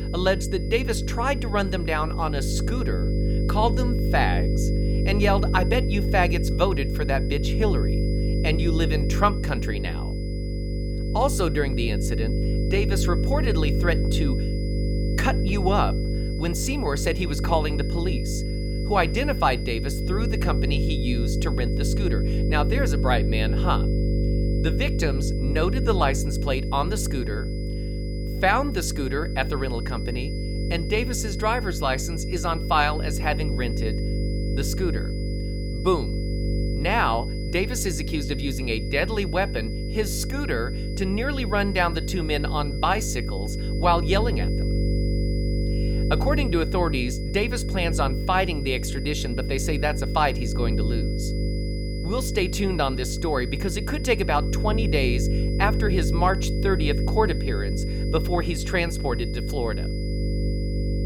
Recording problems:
electrical hum; loud; throughout; 50 Hz, 9 dB below the speech
high-pitched whine; noticeable; throughout; 5 kHz, 15 dB below the speech

